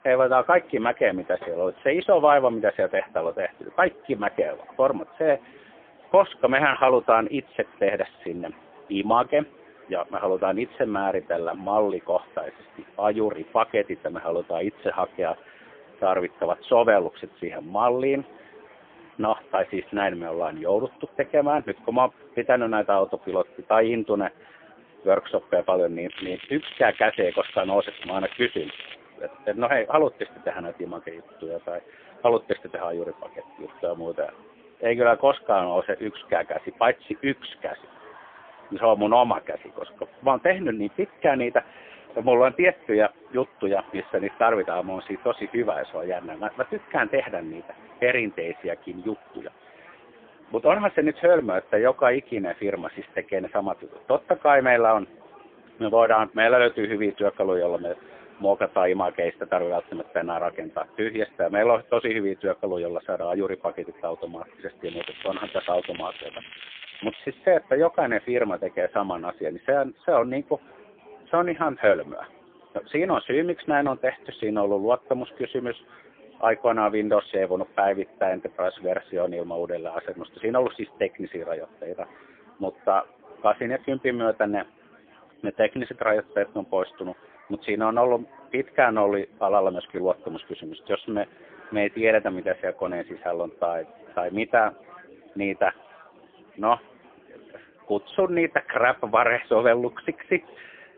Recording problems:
phone-call audio; poor line; nothing above 3.5 kHz
crackling; noticeable; from 26 to 29 s and from 1:05 to 1:07; 15 dB below the speech
chatter from many people; faint; throughout; 25 dB below the speech

